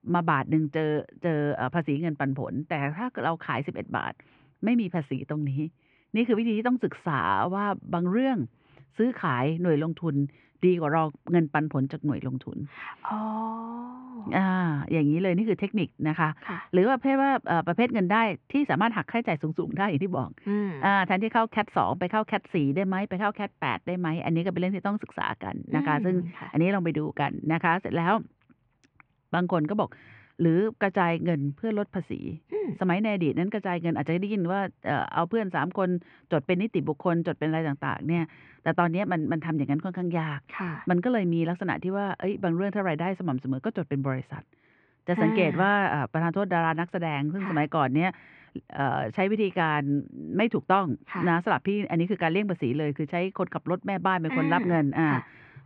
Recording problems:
muffled; very; fading above 2.5 kHz

